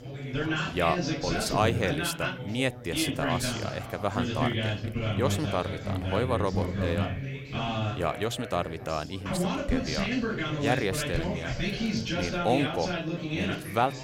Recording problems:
chatter from many people; very loud; throughout; as loud as the speech

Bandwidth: 16 kHz